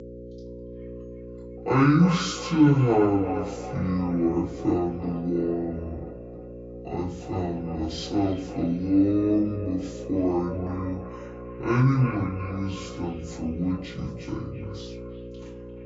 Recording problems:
off-mic speech; far
wrong speed and pitch; too slow and too low; 0.5 times normal speed
echo of what is said; noticeable; throughout; 350 ms later, 15 dB below the speech
room echo; slight; dies away in 0.3 s
electrical hum; noticeable; throughout; 60 Hz, 15 dB below the speech

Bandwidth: 7.5 kHz